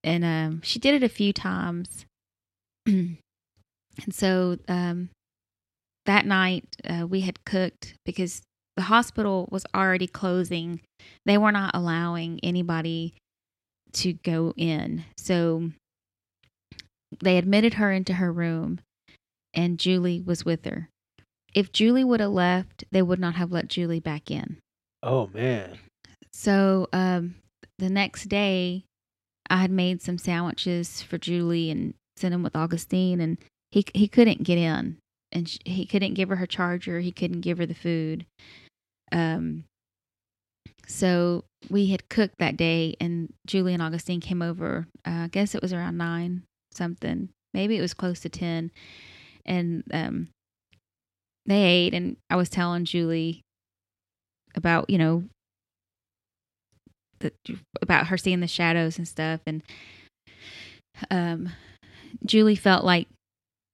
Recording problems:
none

